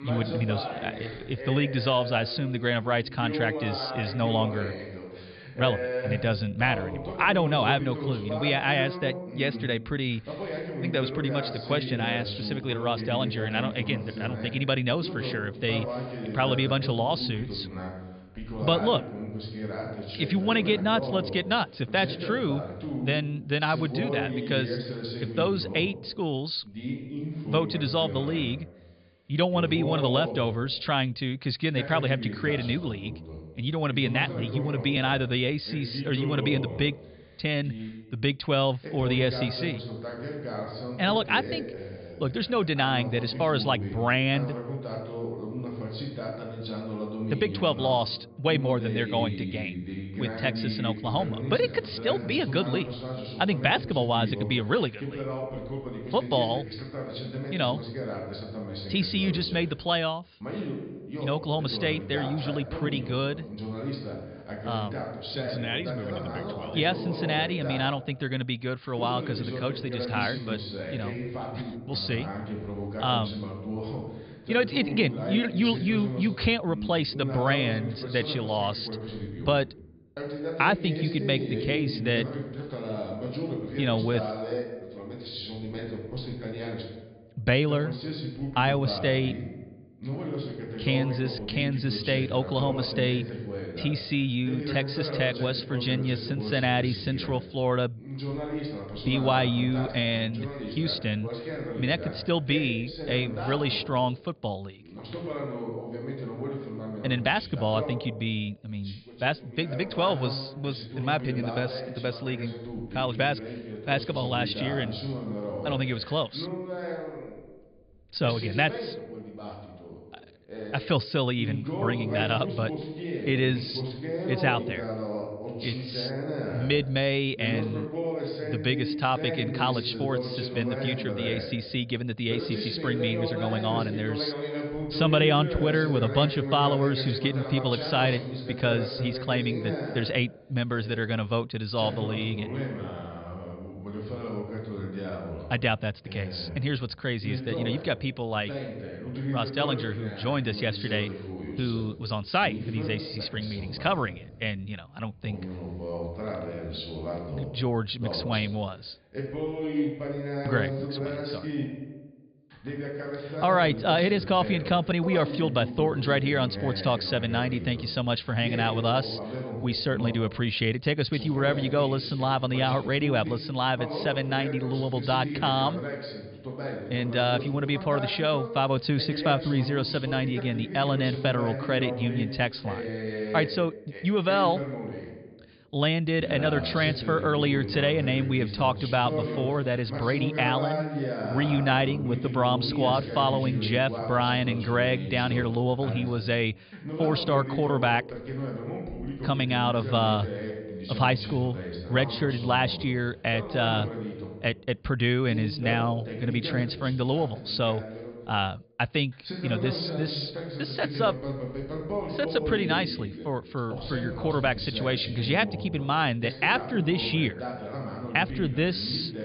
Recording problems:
high frequencies cut off; severe; nothing above 5 kHz
voice in the background; loud; throughout; 7 dB below the speech

